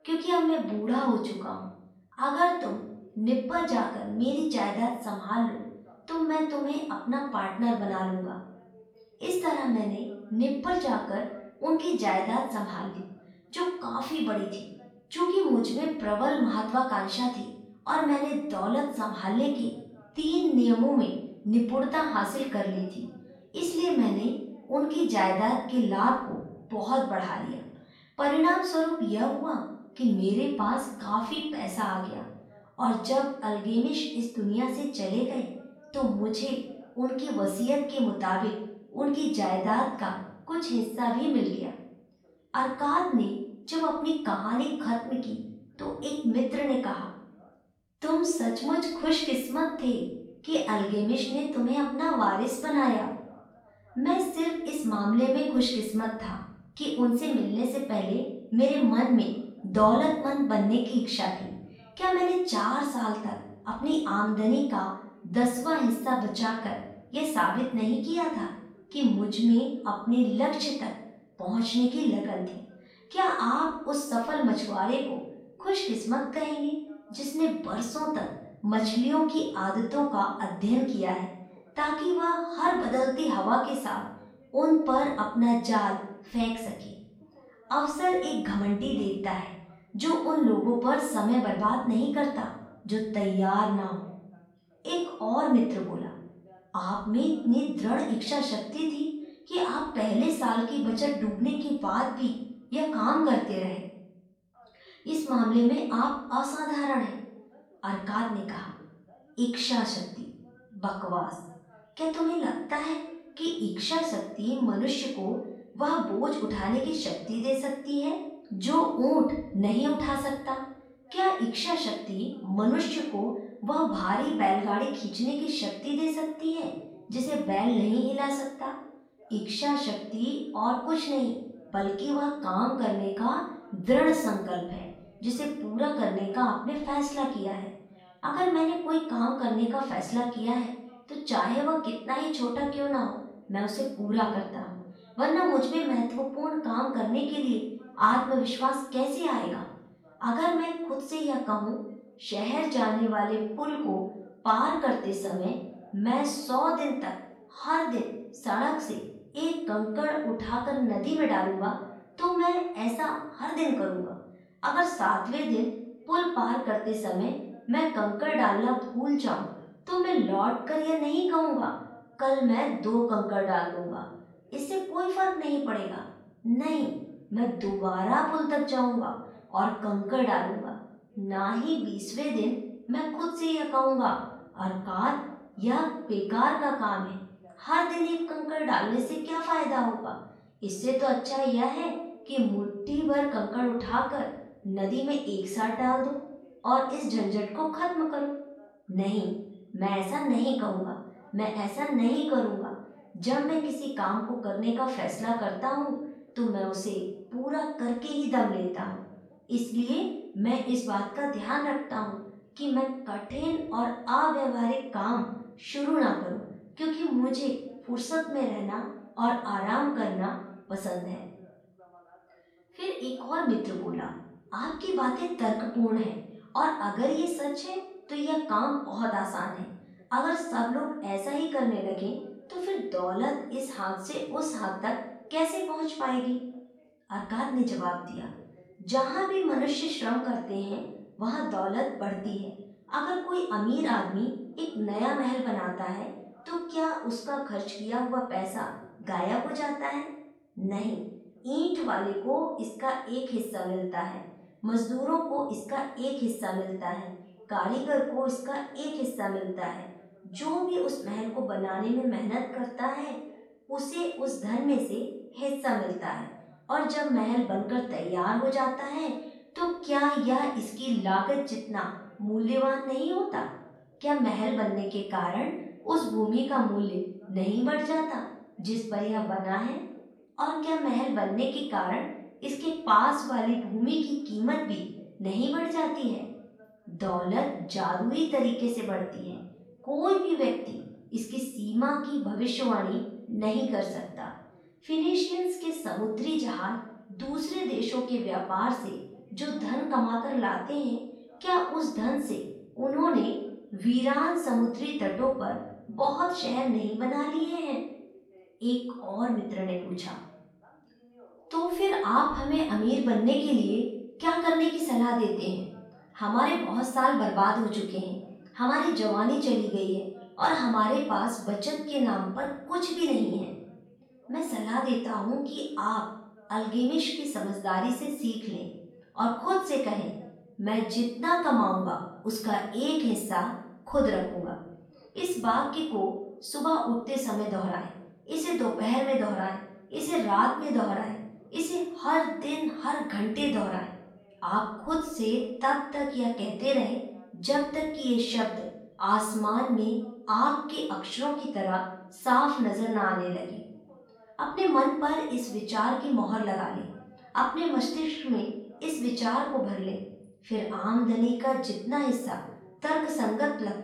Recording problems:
off-mic speech; far
room echo; noticeable; dies away in 0.7 s
voice in the background; faint; throughout; 30 dB below the speech

